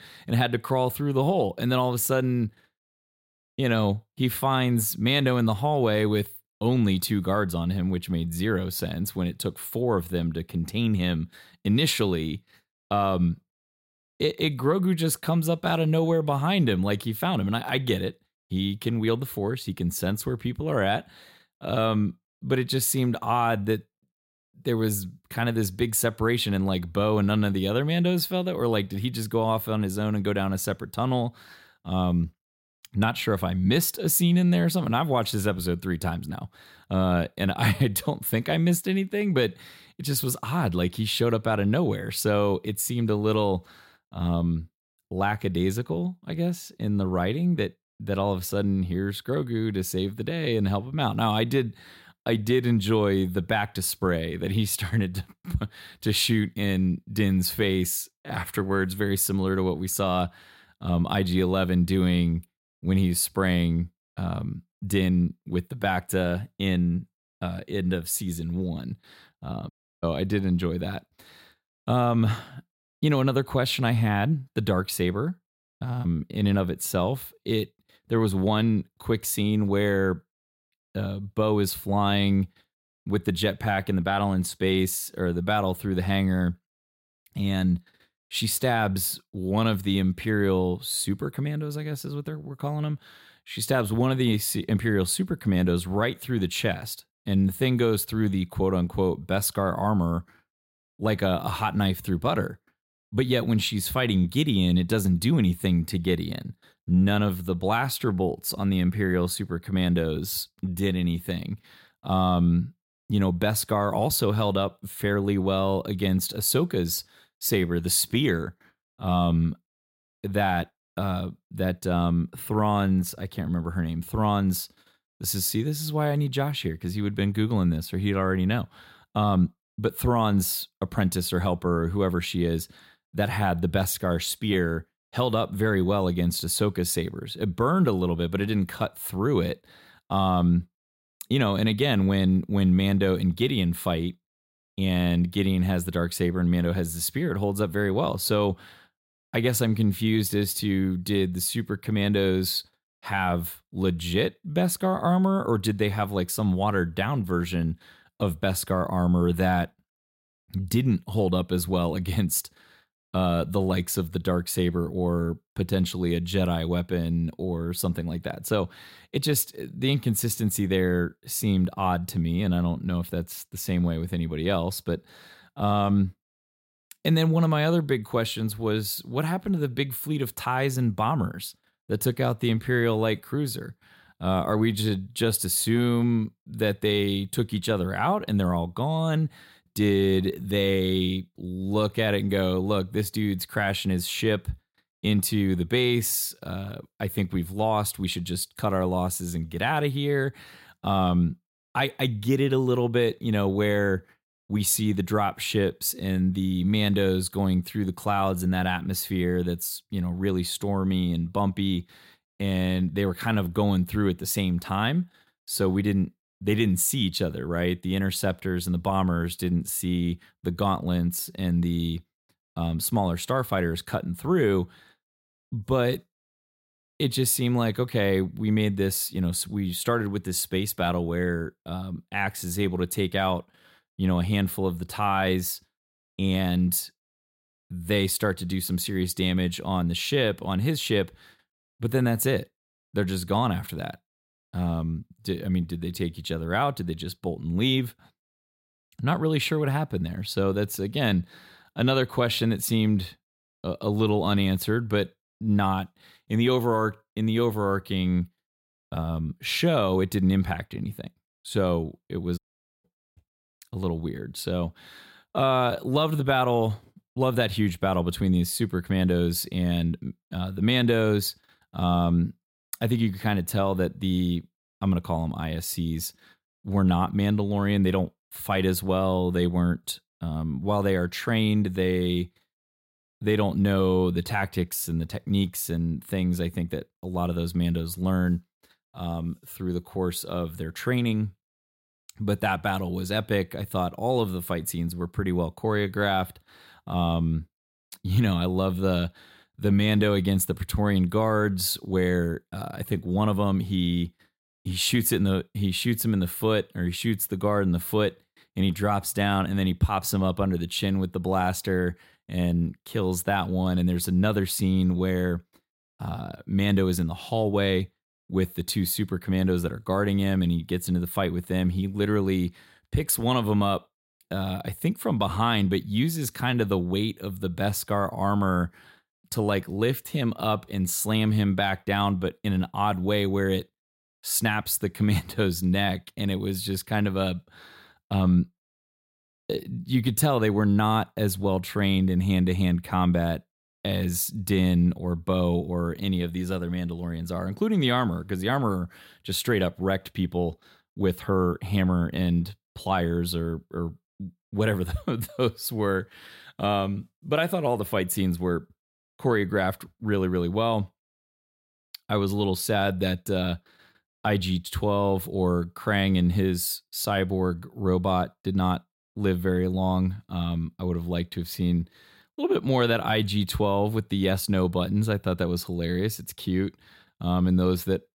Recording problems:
audio cutting out; at 1:10 and at 4:22

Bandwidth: 16 kHz